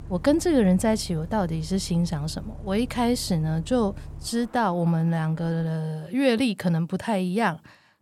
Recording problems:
traffic noise; noticeable; until 5.5 s; 15 dB below the speech

